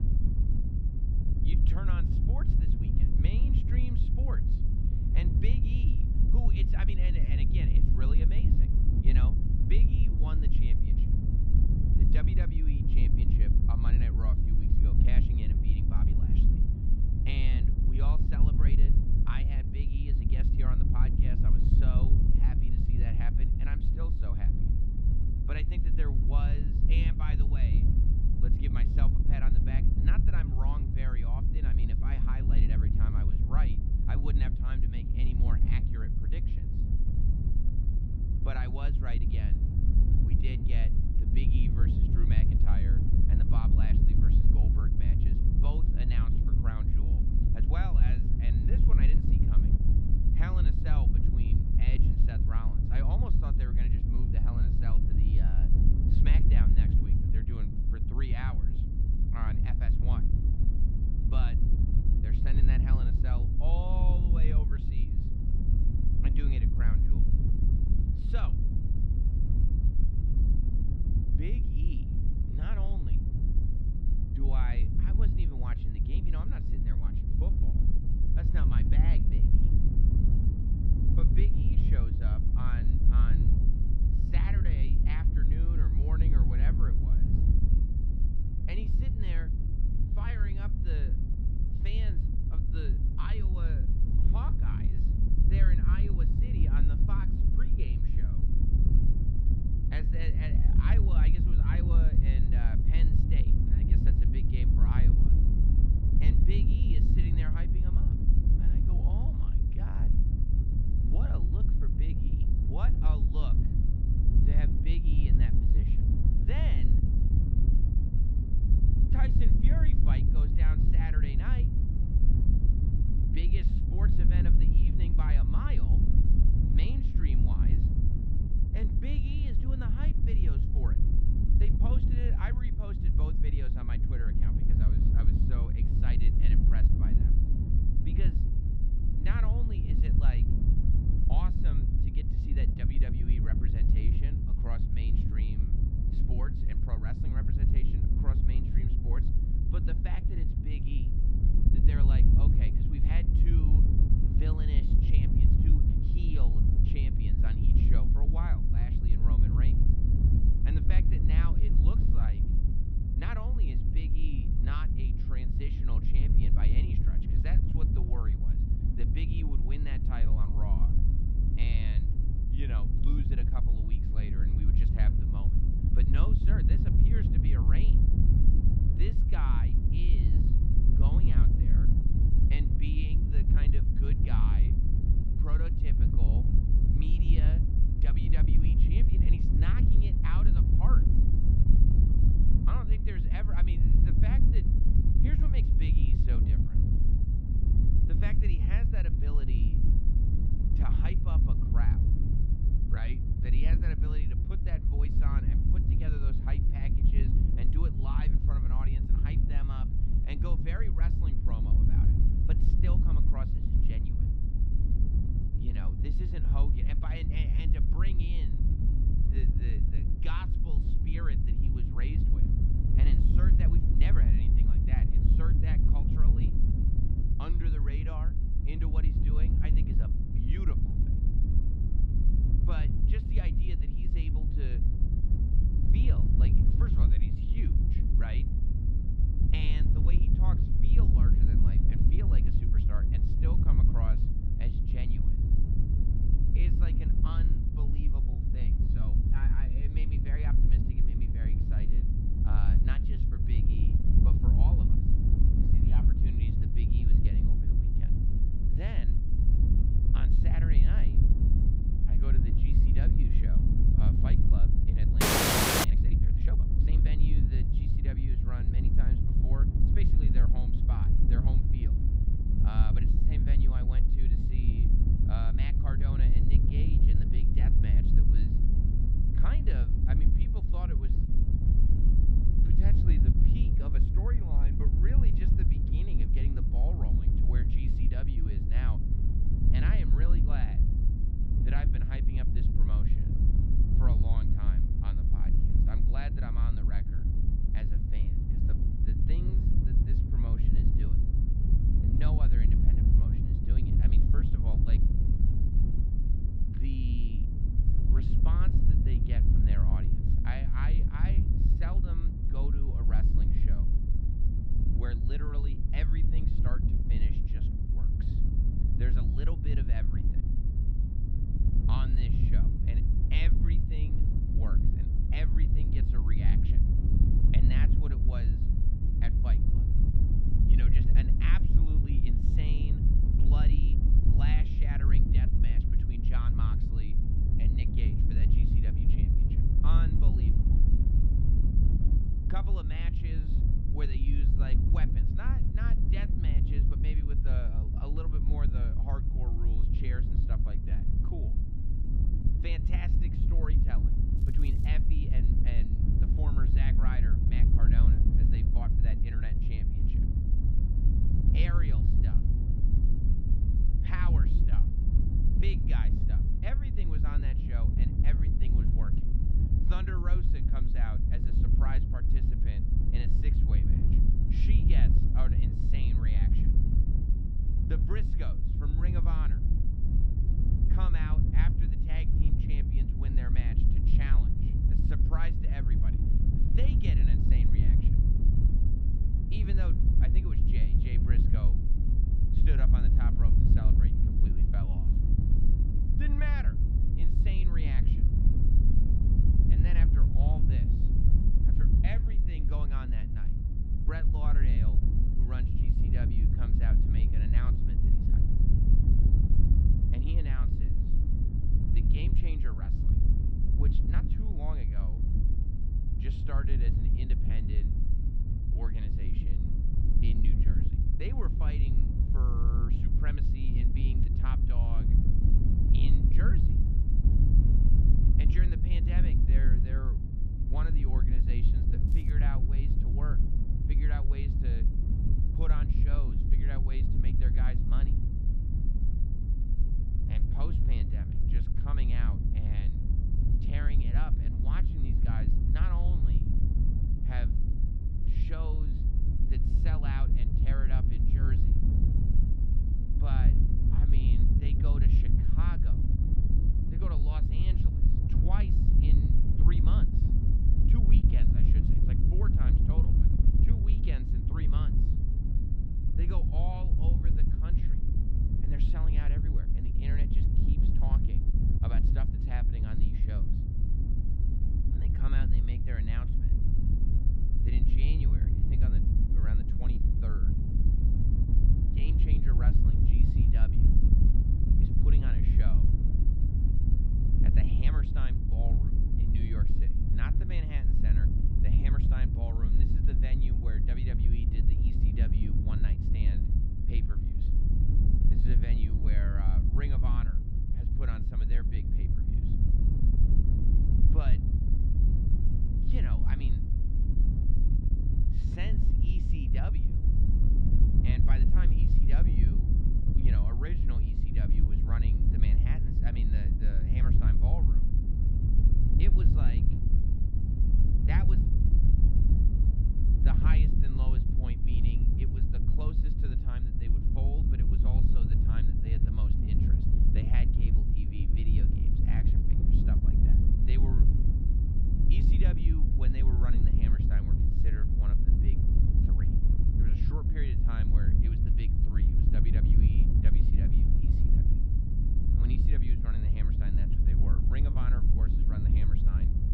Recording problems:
muffled; very slightly; fading above 3 kHz
wind noise on the microphone; heavy; 2 dB above the speech
crackling; noticeable; at 5:54 and at 7:12; 20 dB below the speech
audio freezing; at 4:25 for 0.5 s

